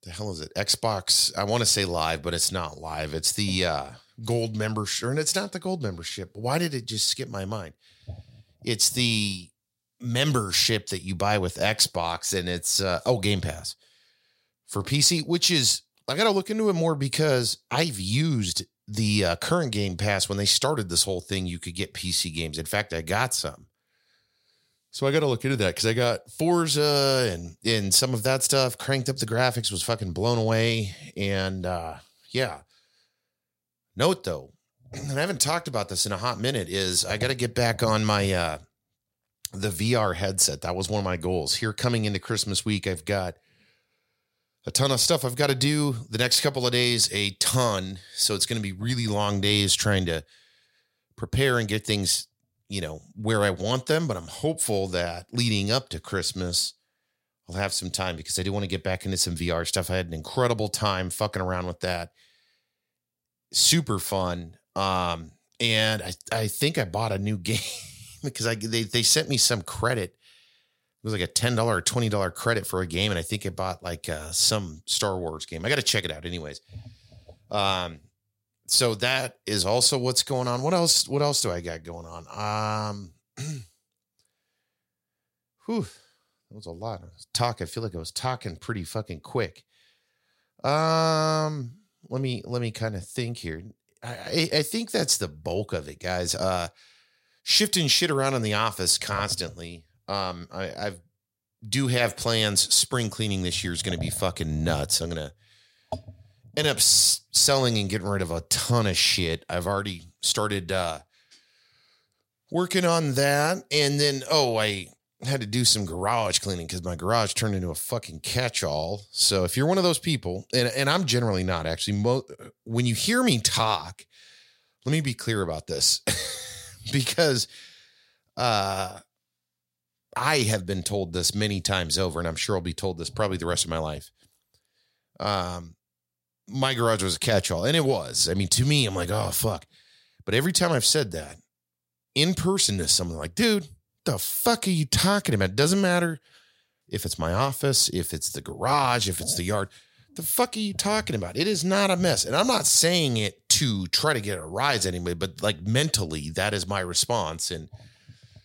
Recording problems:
none

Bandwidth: 16 kHz